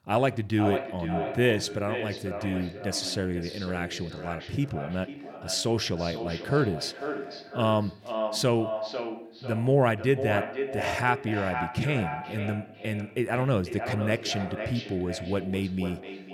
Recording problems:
echo of what is said; strong; throughout; 500 ms later, 7 dB below the speech

